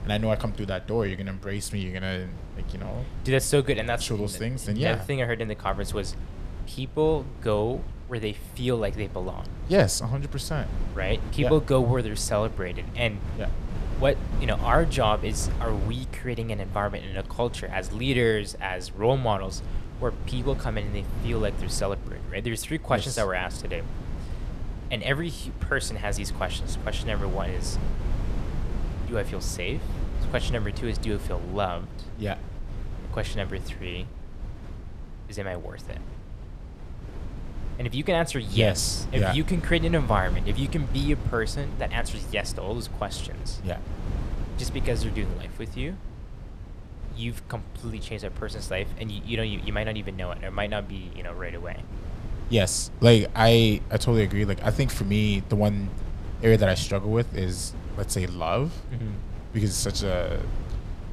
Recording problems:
wind noise on the microphone; occasional gusts; 15 dB below the speech

